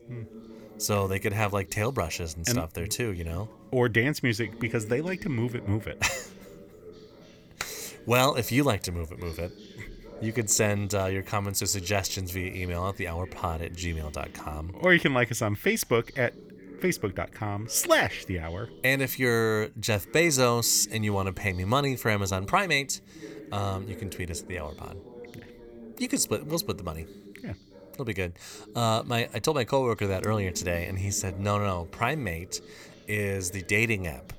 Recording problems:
voice in the background; noticeable; throughout; 20 dB below the speech

